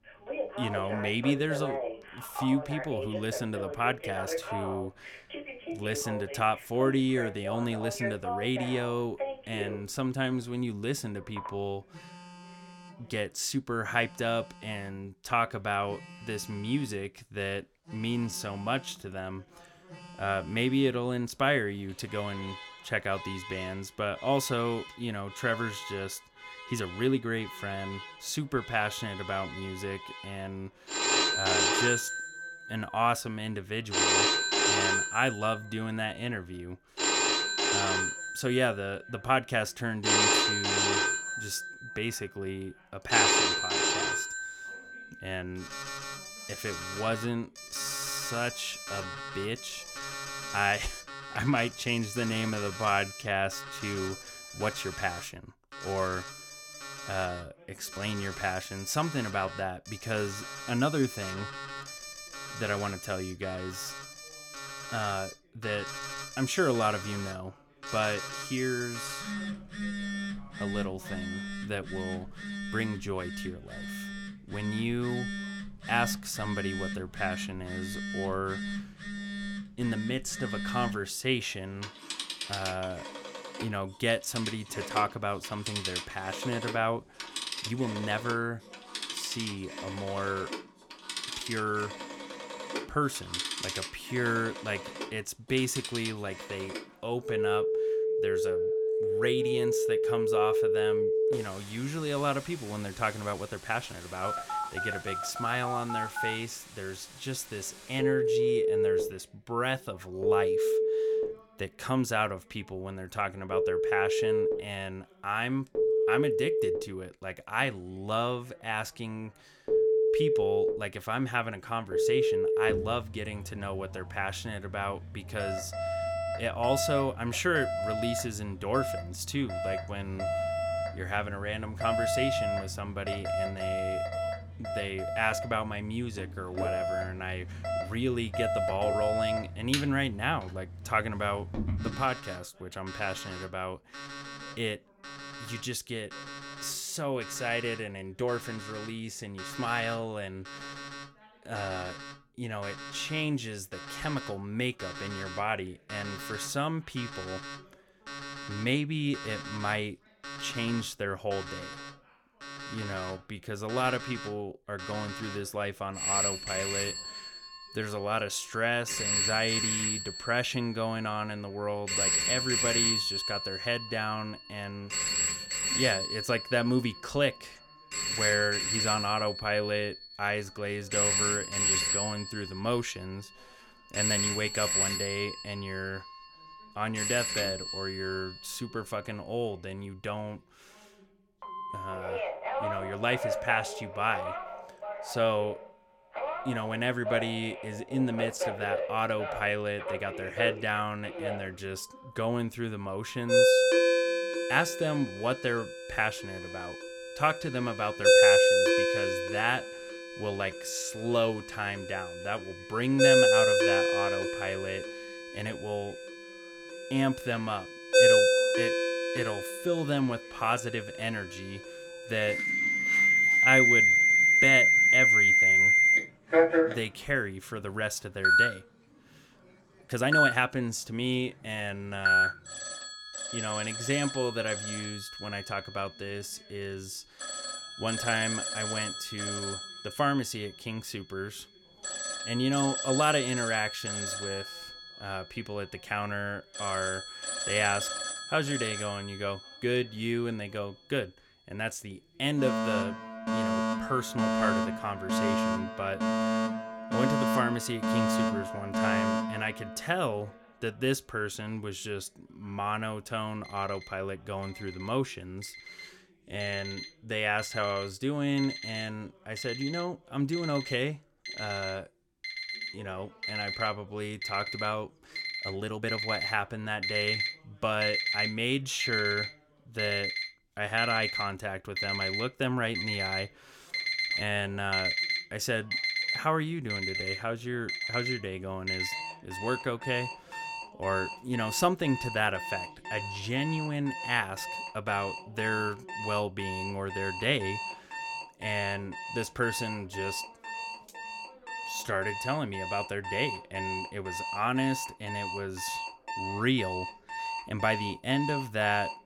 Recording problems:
alarms or sirens; very loud; throughout; 3 dB above the speech
voice in the background; faint; throughout; 30 dB below the speech
uneven, jittery; strongly; from 2 s to 5:02

